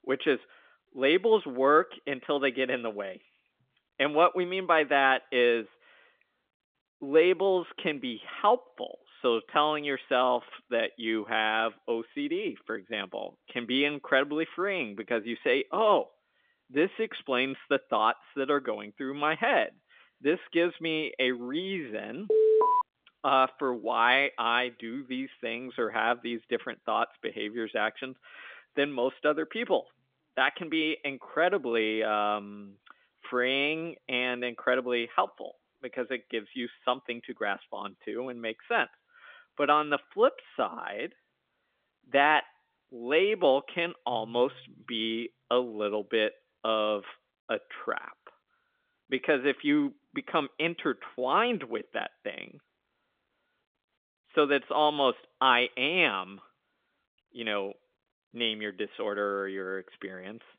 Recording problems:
phone-call audio; nothing above 3.5 kHz
alarm; loud; at 22 s; peak 6 dB above the speech

